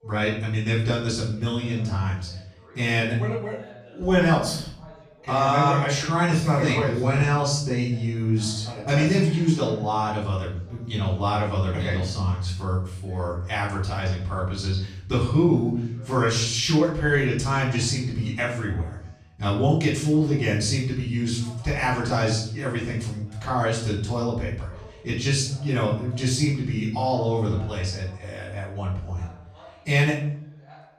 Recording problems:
off-mic speech; far
room echo; noticeable; dies away in 0.6 s
voice in the background; faint; throughout; 25 dB below the speech

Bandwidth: 14 kHz